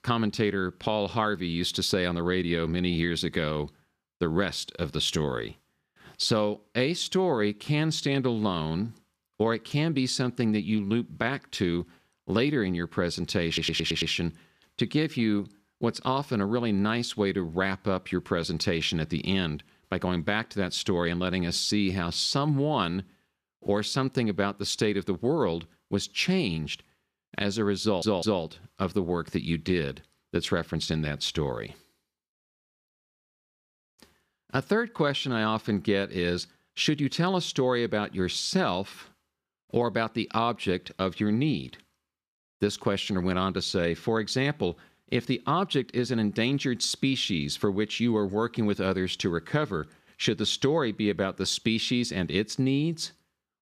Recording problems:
audio stuttering; at 13 s and at 28 s

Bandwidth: 14.5 kHz